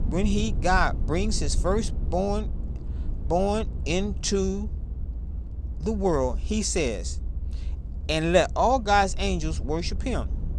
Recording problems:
low rumble; faint; throughout; 20 dB below the speech

